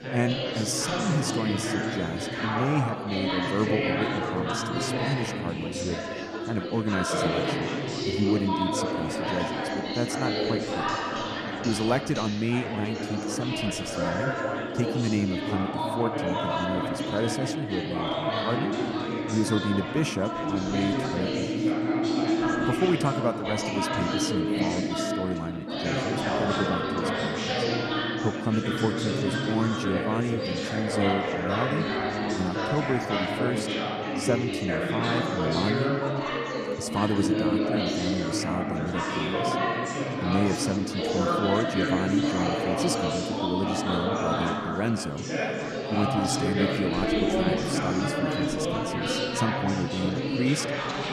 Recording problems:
chatter from many people; very loud; throughout; 2 dB above the speech

